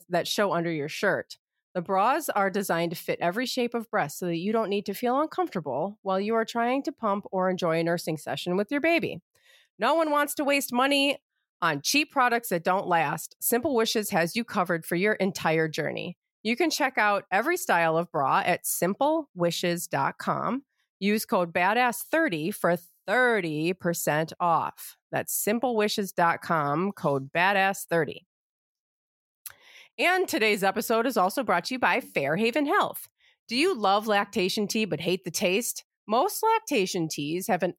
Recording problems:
none

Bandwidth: 16.5 kHz